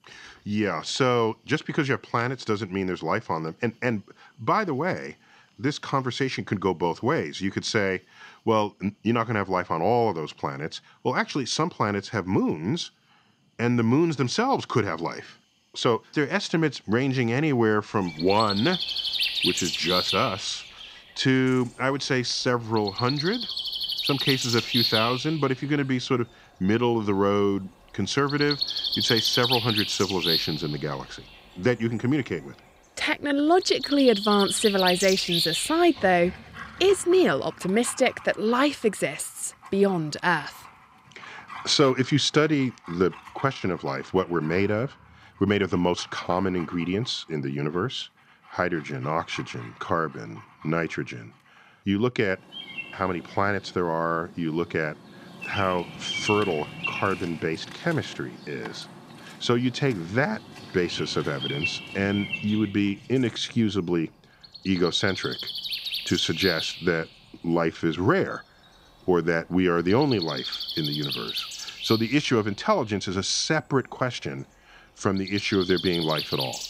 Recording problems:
animal sounds; loud; throughout; 4 dB below the speech

